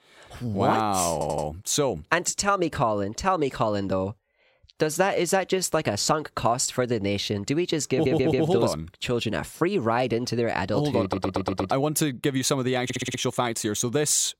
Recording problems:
audio stuttering; 4 times, first at 1 s

